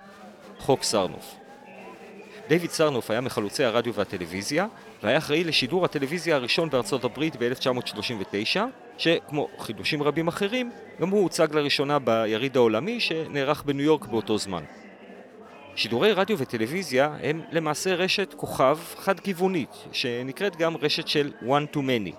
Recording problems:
murmuring crowd; noticeable; throughout; 20 dB below the speech

